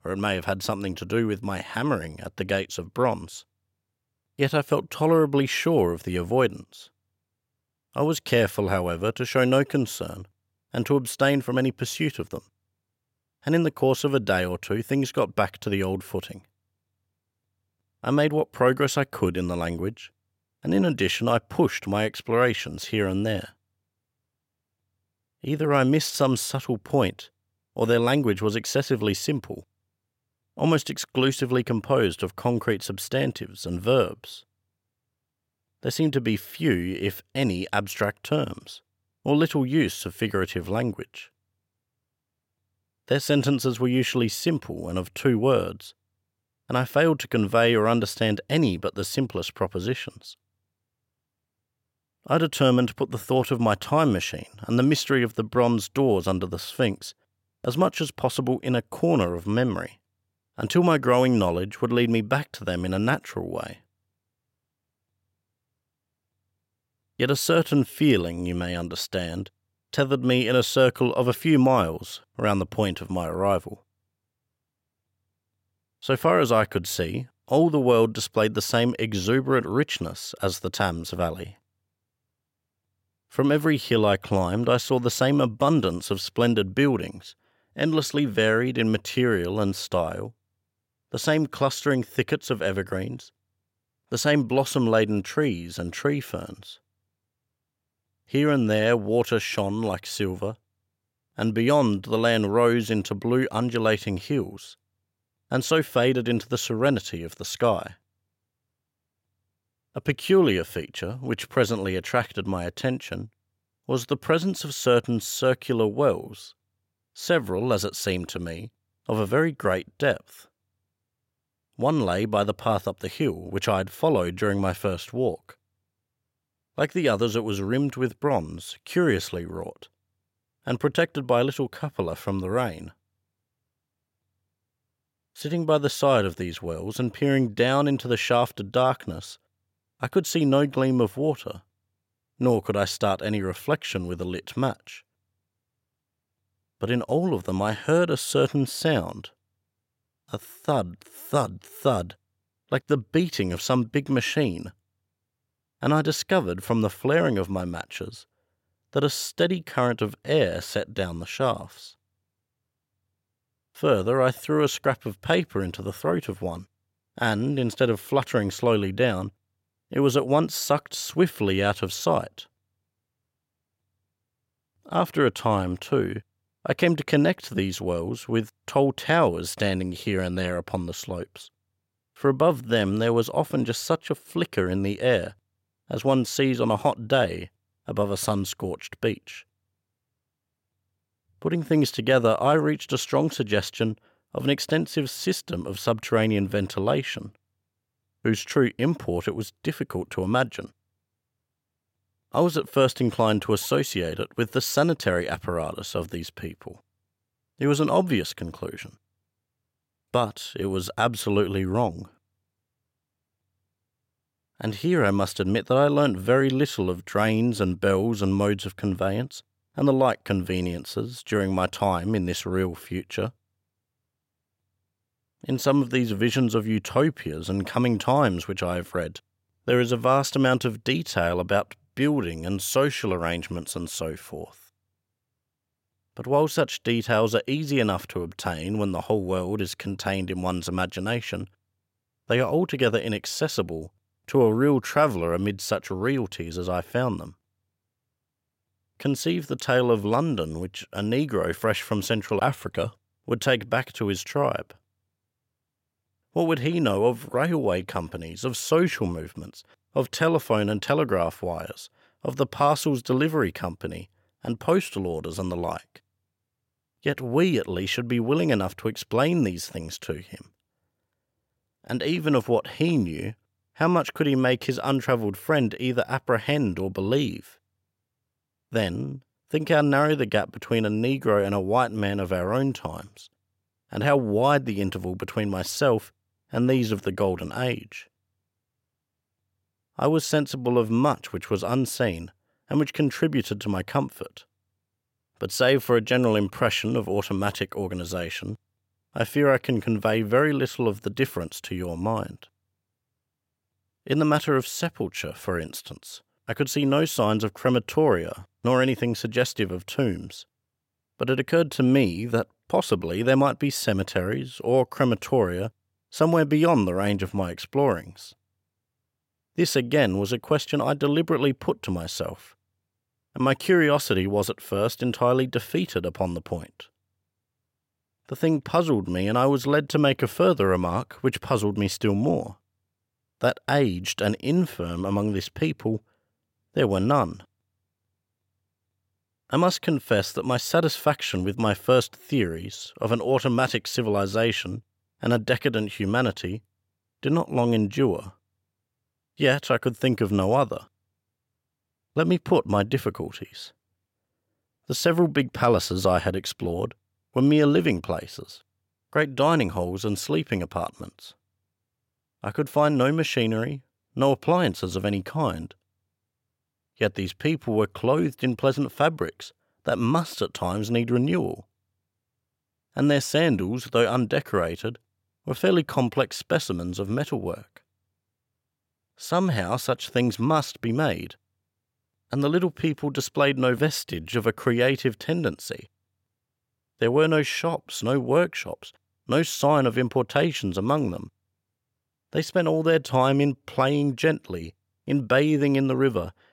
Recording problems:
none

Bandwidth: 16.5 kHz